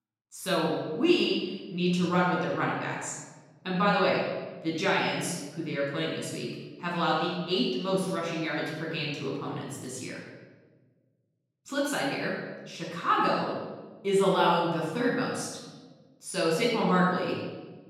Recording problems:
off-mic speech; far
room echo; noticeable; dies away in 1.2 s

